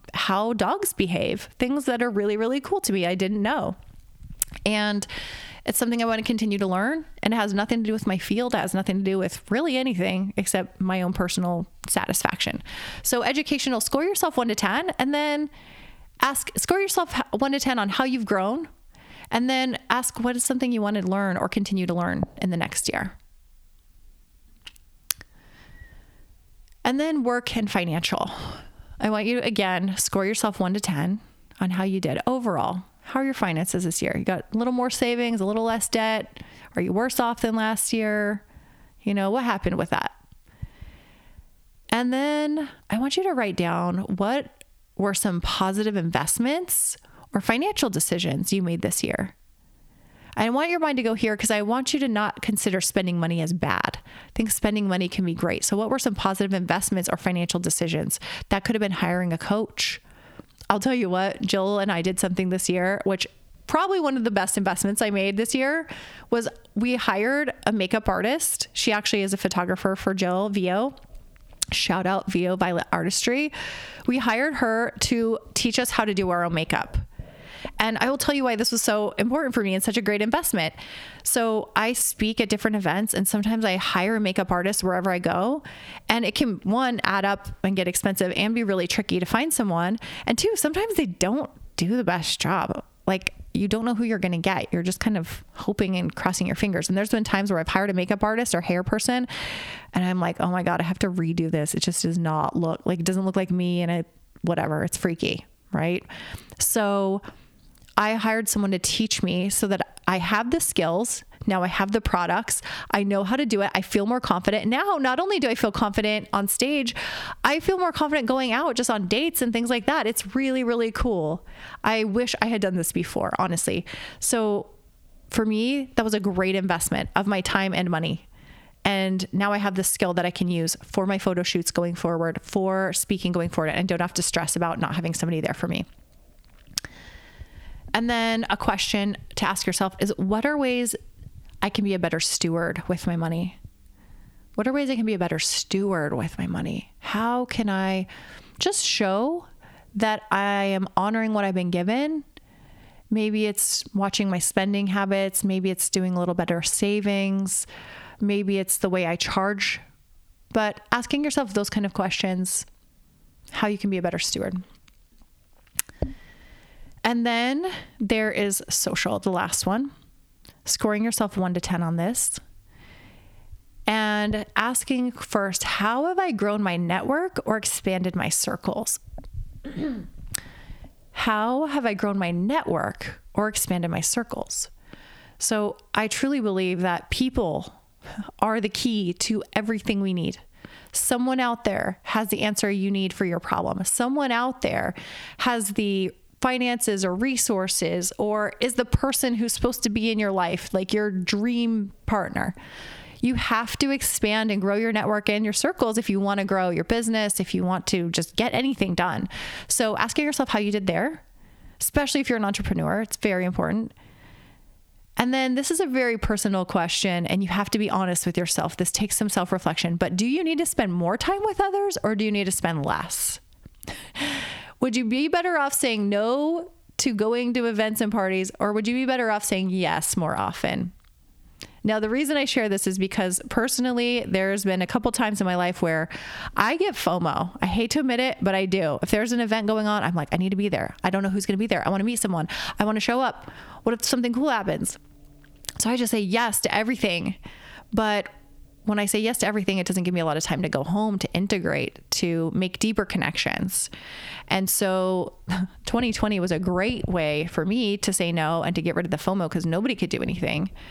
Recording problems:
squashed, flat; heavily

